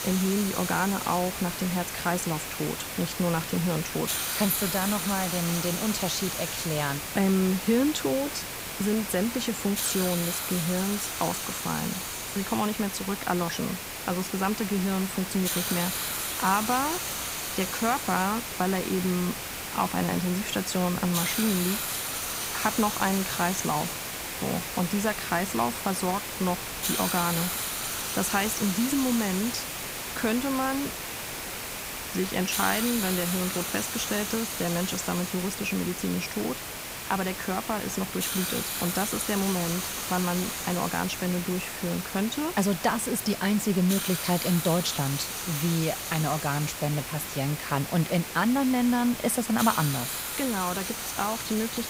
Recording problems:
hiss; loud; throughout; 3 dB below the speech

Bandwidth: 15.5 kHz